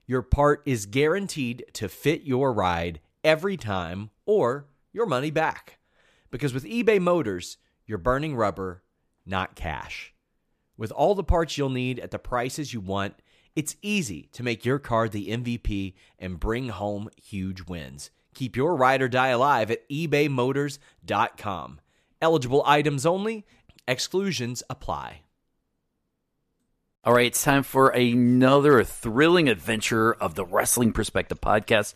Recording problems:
none

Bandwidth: 14.5 kHz